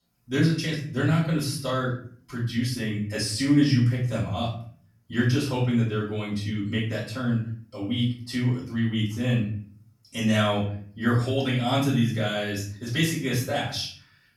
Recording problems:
off-mic speech; far
room echo; noticeable; dies away in 0.5 s

